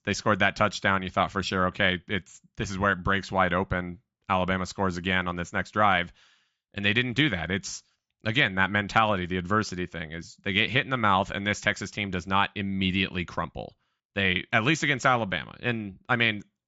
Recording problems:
high frequencies cut off; noticeable; nothing above 8 kHz

